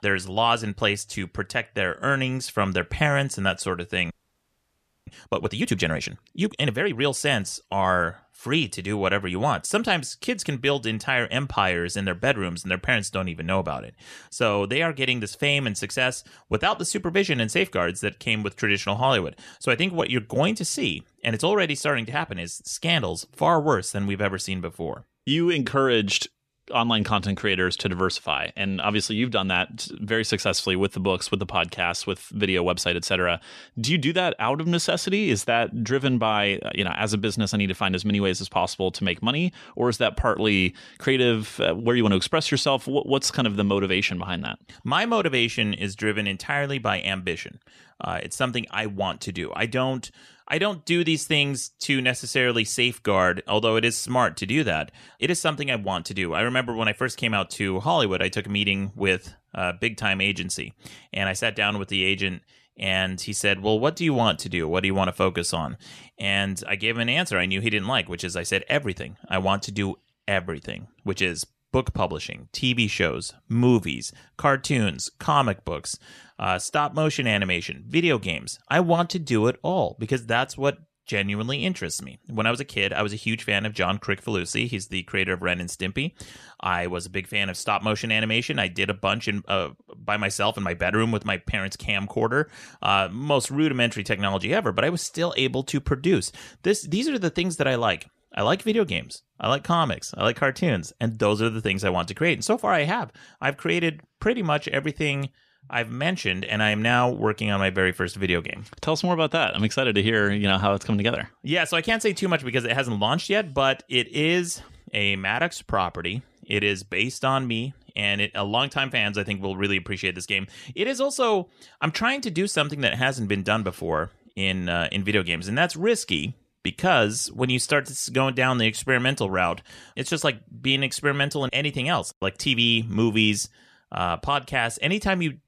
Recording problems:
audio freezing; at 4 s for 1 s

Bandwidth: 14.5 kHz